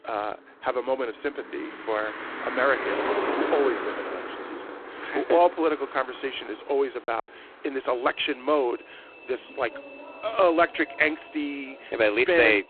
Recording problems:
phone-call audio; poor line; nothing above 3.5 kHz
traffic noise; loud; throughout; 8 dB below the speech
choppy; occasionally; at 7 s; 2% of the speech affected

